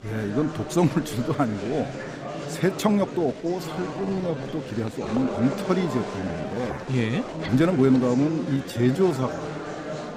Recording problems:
murmuring crowd; loud; throughout; 8 dB below the speech
uneven, jittery; strongly; from 3 to 9 s

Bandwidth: 15.5 kHz